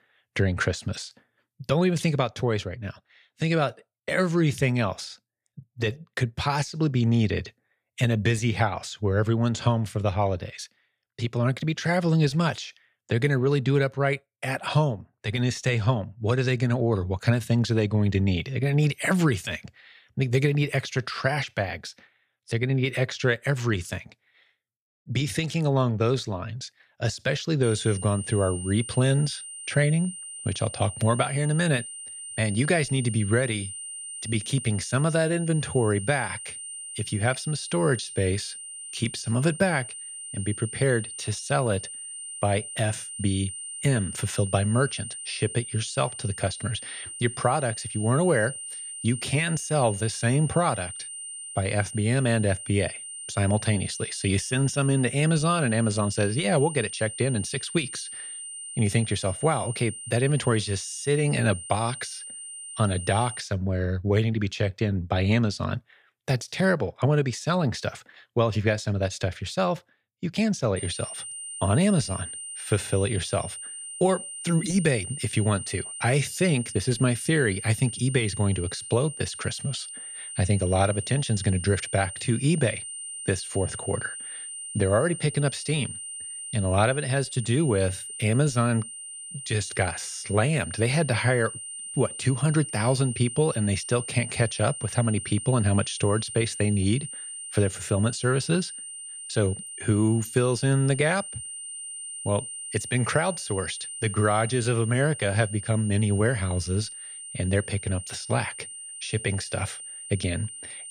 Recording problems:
high-pitched whine; loud; from 28 s to 1:03 and from 1:11 on; 9 kHz, 9 dB below the speech

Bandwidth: 14 kHz